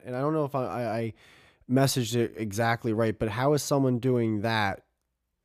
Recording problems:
none

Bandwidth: 14.5 kHz